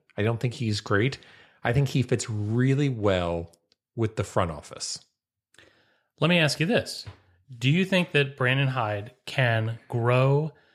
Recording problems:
none

